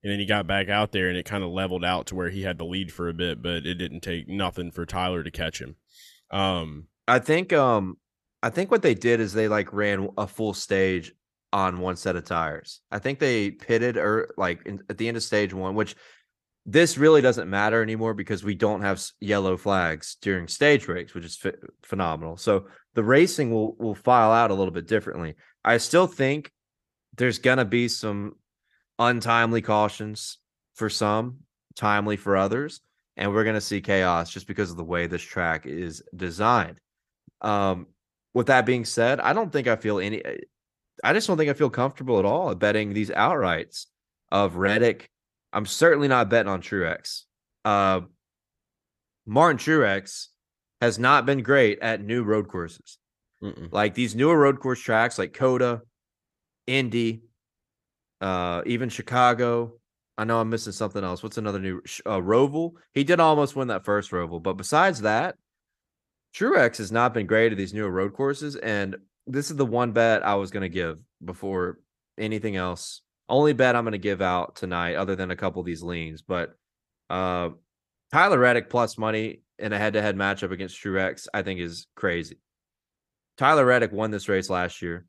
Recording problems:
none

